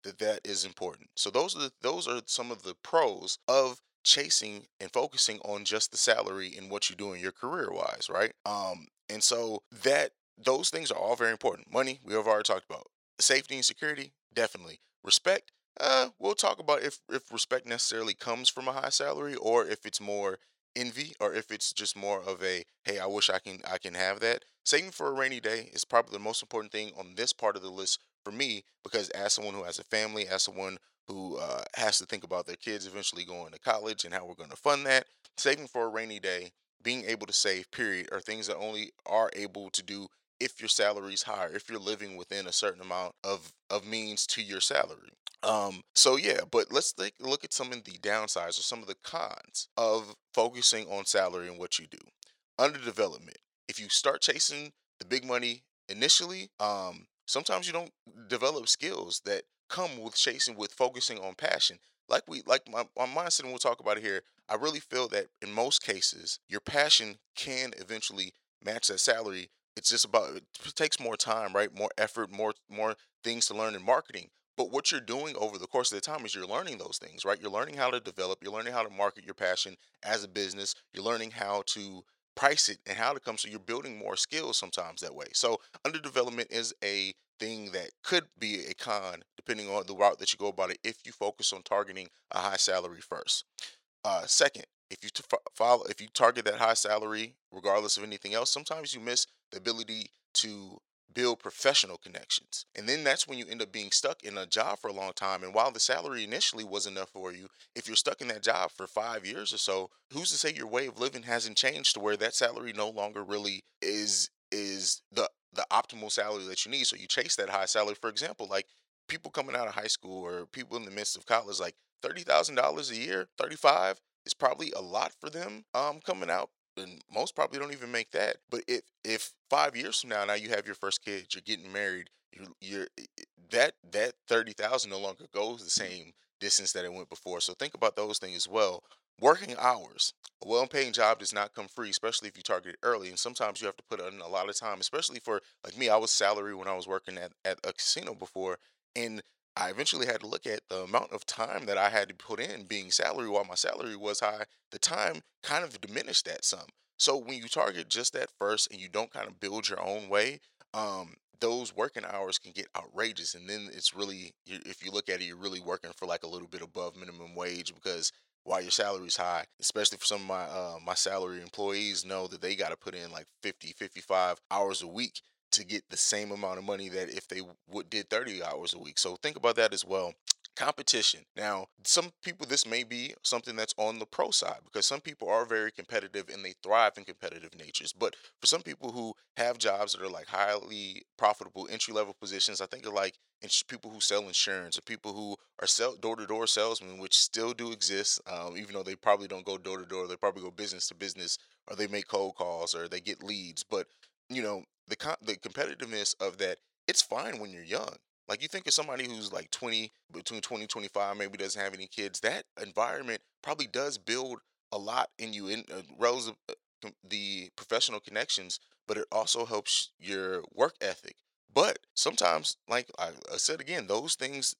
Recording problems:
thin; very; fading below 550 Hz

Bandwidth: 16 kHz